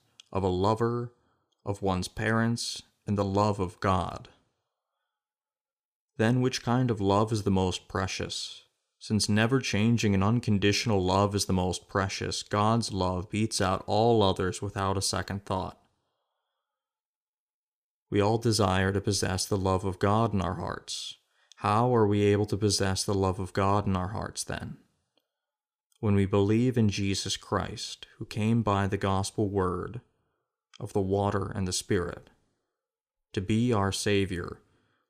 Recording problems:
none

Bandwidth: 15 kHz